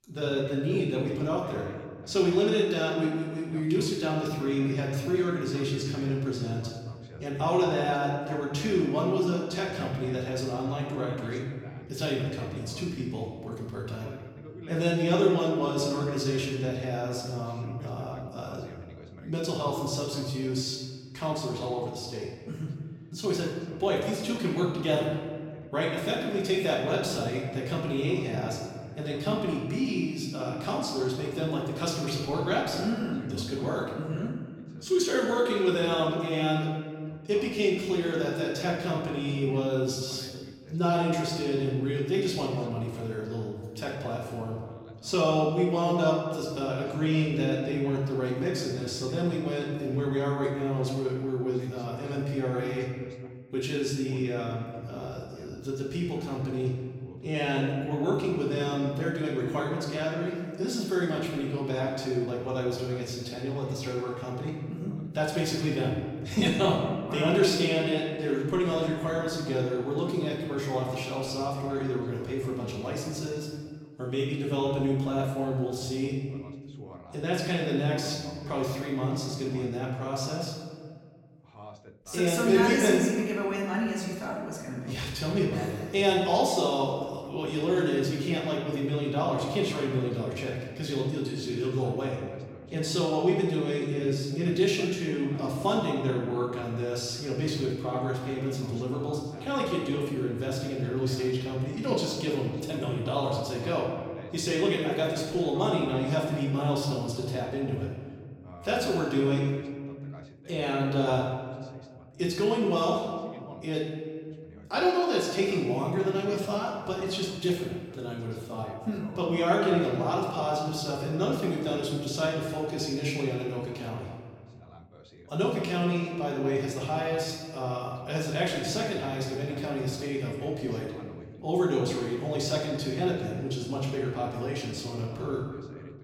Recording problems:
off-mic speech; far
room echo; noticeable; dies away in 1.6 s
voice in the background; faint; throughout; 20 dB below the speech

